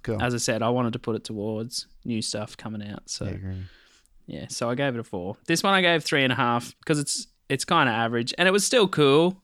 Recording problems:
none

